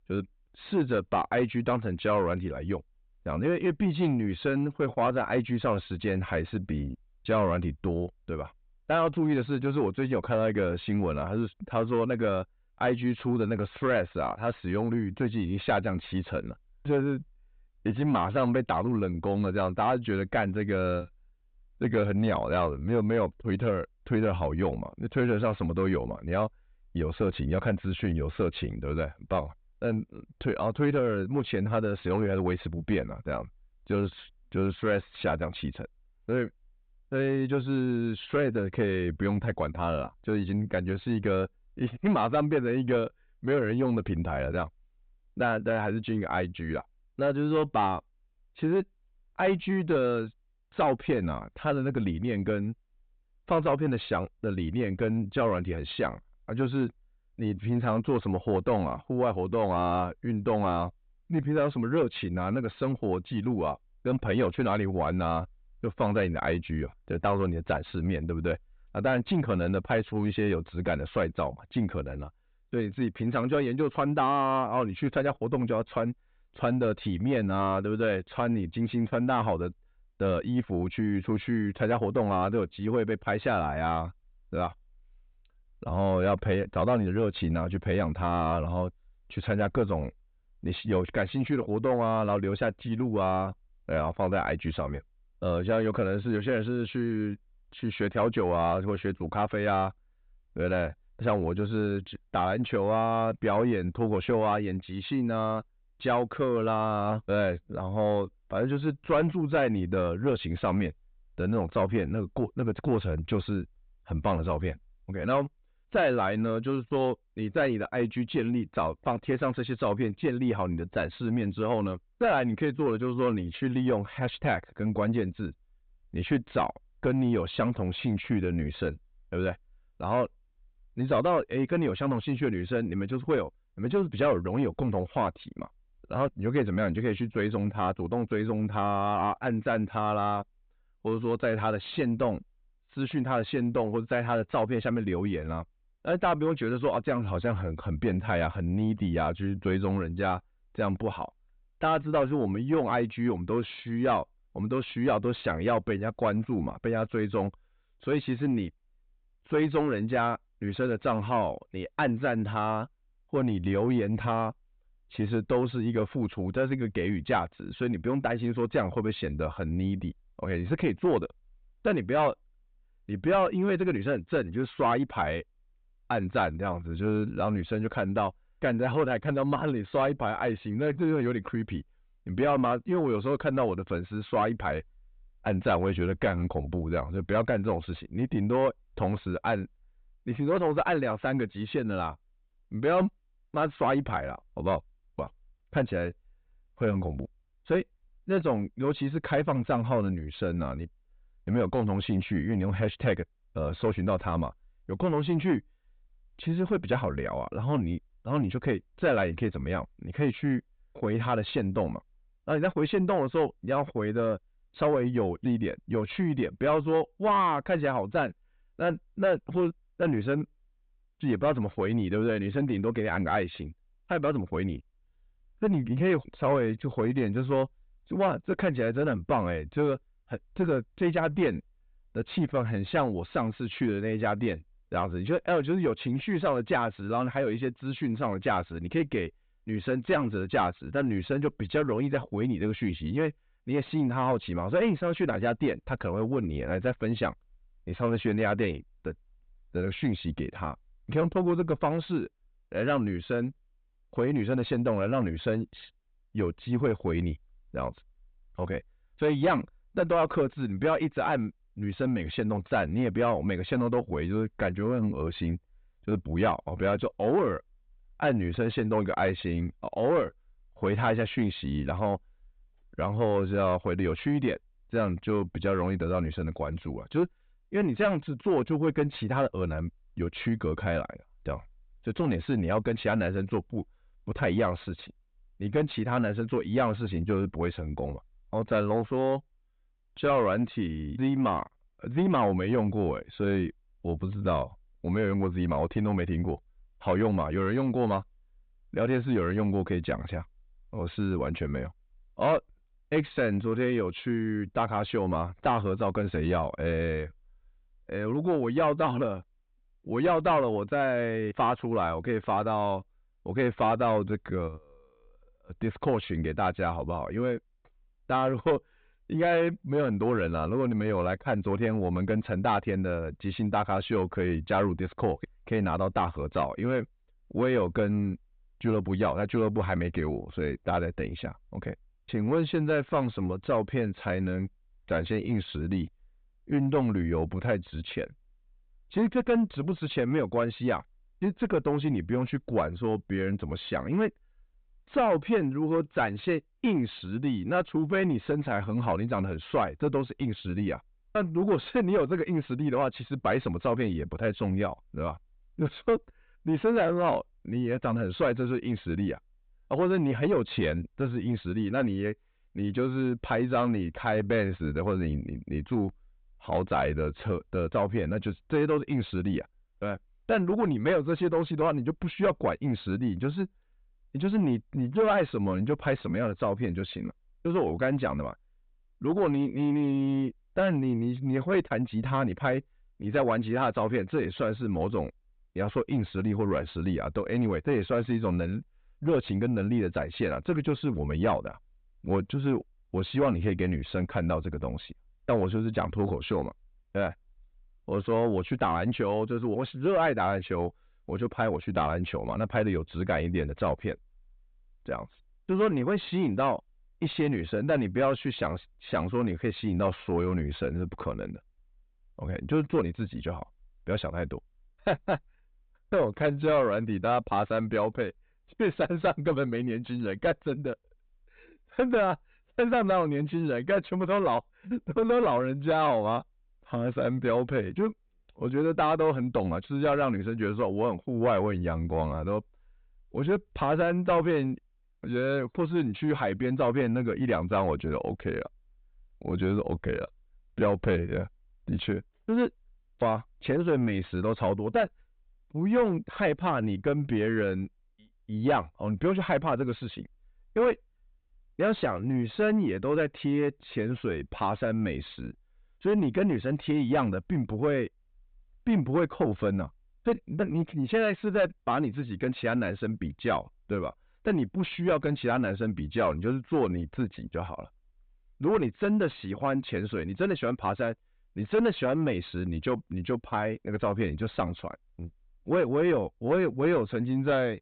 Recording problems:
high frequencies cut off; severe; nothing above 4 kHz
distortion; slight; 10 dB below the speech

